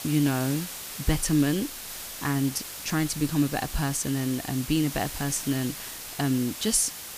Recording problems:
hiss; loud; throughout; 8 dB below the speech

